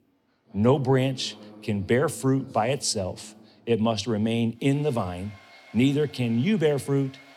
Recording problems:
household noises; faint; throughout; 25 dB below the speech

